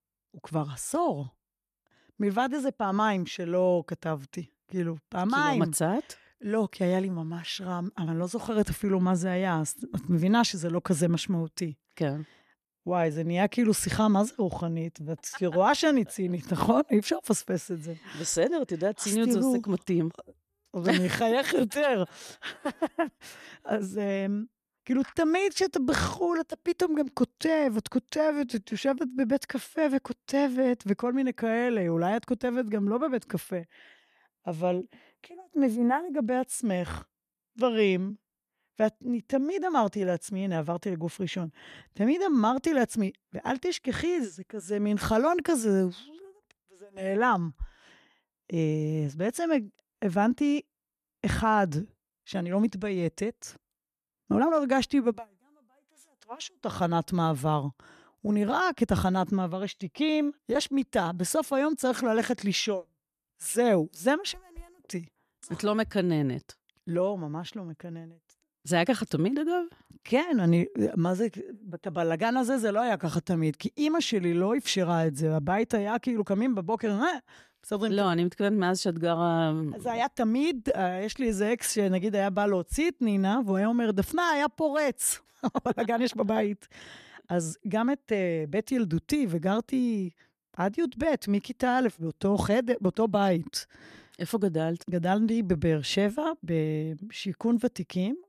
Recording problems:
uneven, jittery; strongly; from 2.5 s to 1:26

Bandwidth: 14 kHz